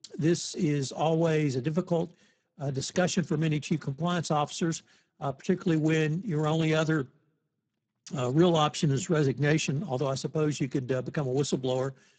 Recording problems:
garbled, watery; badly; nothing above 8 kHz

